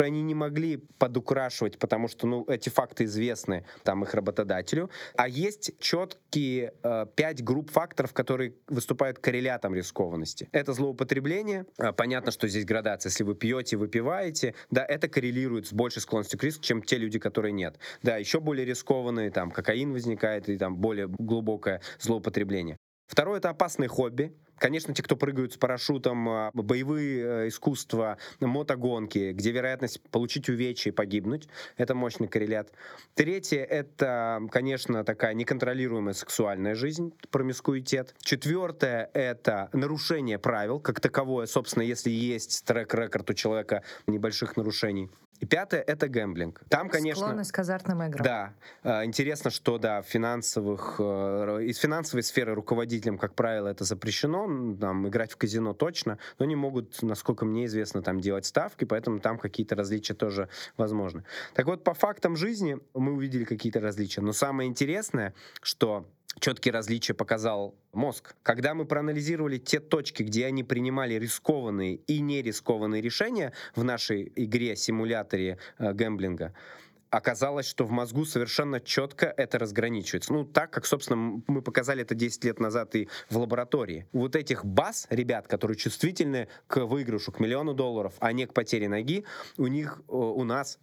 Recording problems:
squashed, flat; somewhat
abrupt cut into speech; at the start

